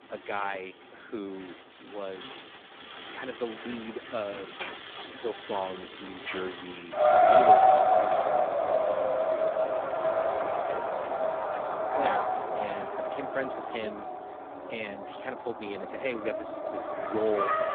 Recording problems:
phone-call audio; poor line
traffic noise; very loud; throughout; 10 dB above the speech

